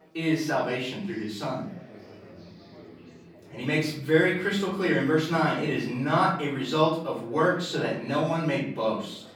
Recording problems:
off-mic speech; far
room echo; noticeable; dies away in 0.5 s
chatter from many people; faint; throughout; 25 dB below the speech

